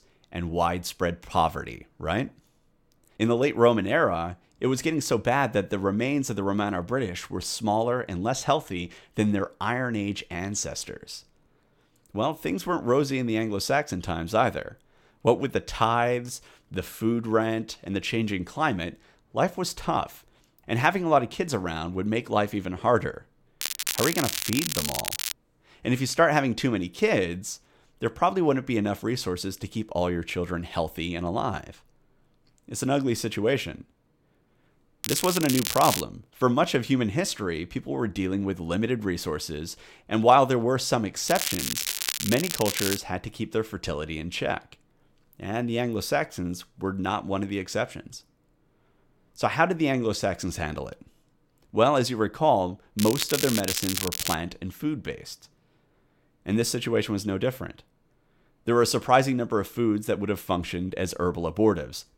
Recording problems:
crackling; loud; 4 times, first at 24 s; 2 dB below the speech

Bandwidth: 16.5 kHz